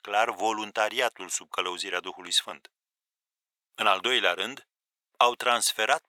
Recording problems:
thin; very; fading below 800 Hz

